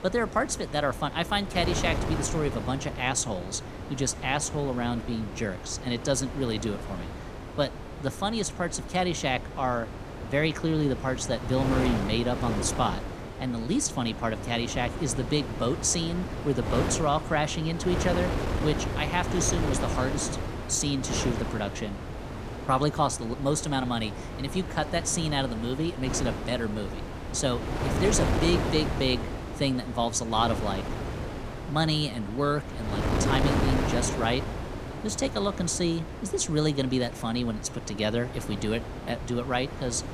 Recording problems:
wind noise on the microphone; heavy; 7 dB below the speech

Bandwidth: 14.5 kHz